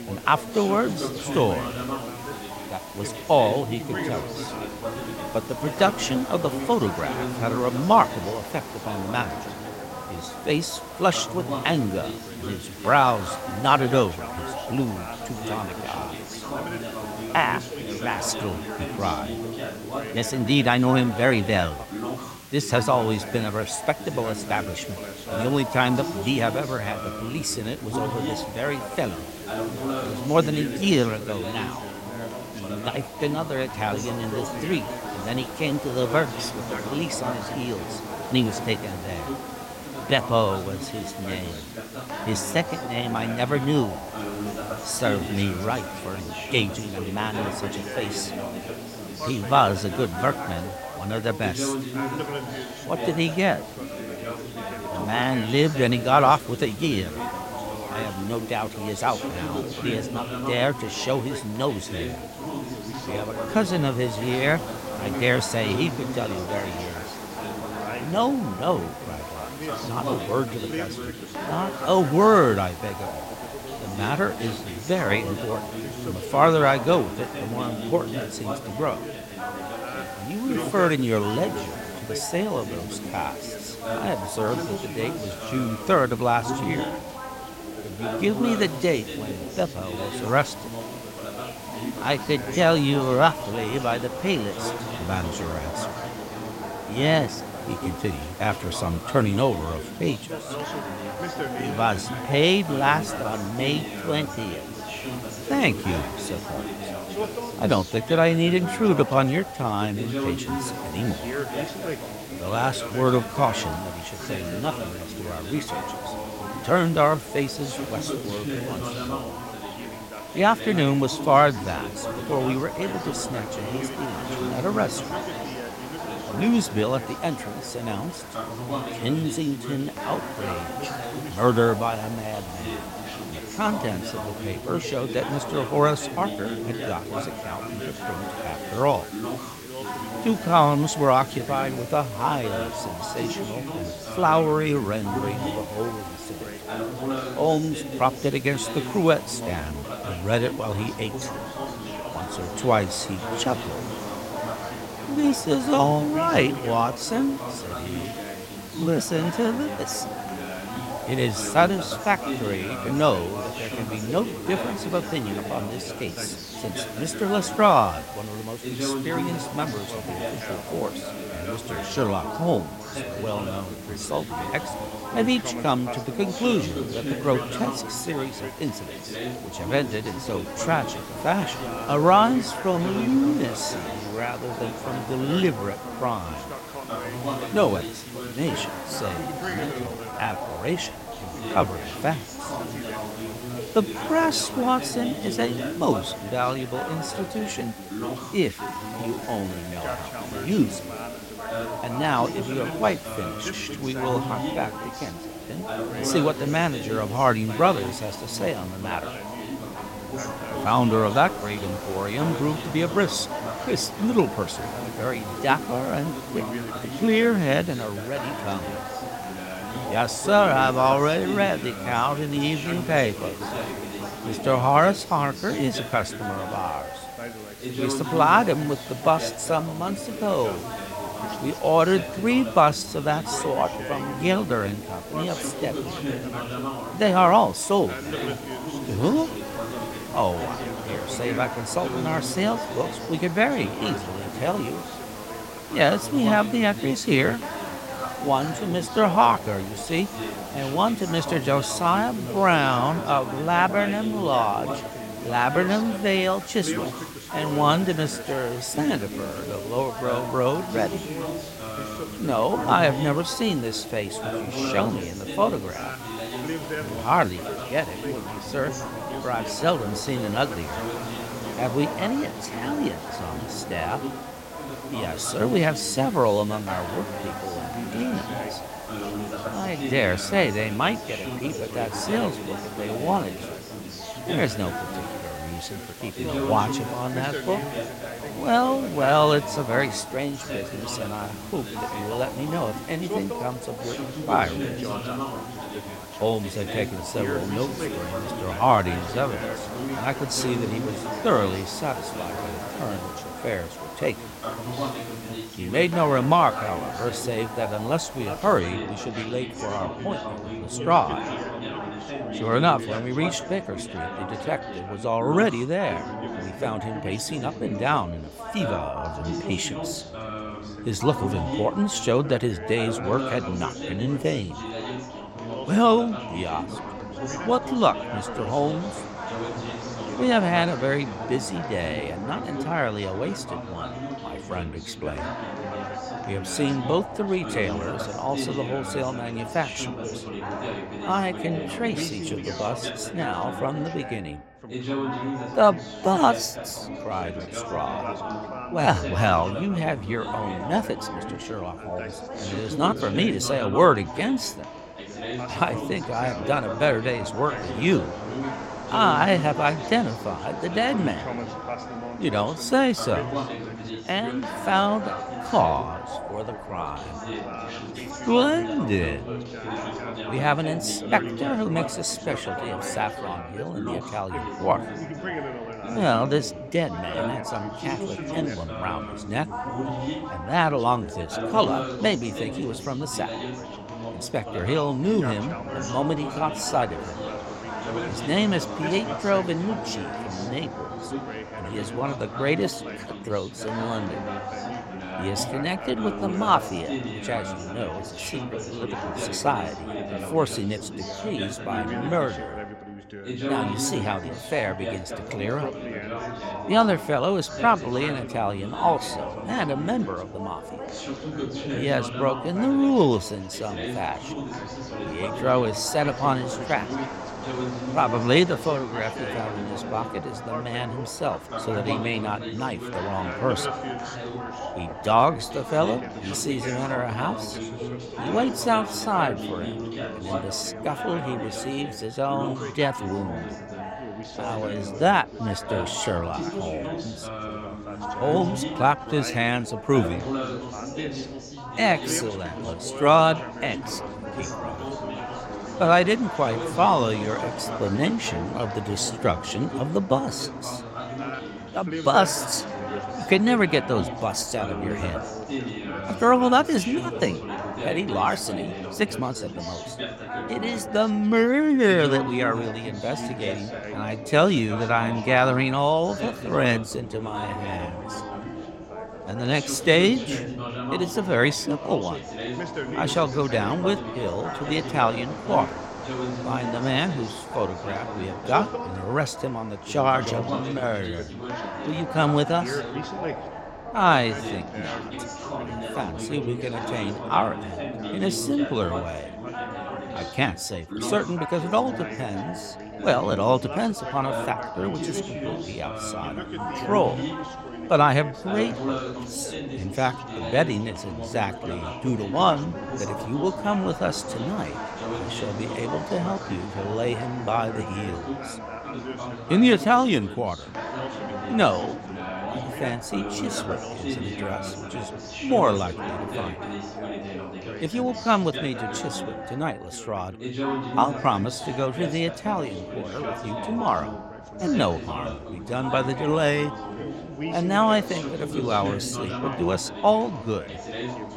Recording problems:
background chatter; loud; throughout; 3 voices, 8 dB below the speech
hiss; noticeable; until 5:09; 20 dB below the speech
uneven, jittery; strongly; from 1:58 to 7:20

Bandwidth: 16 kHz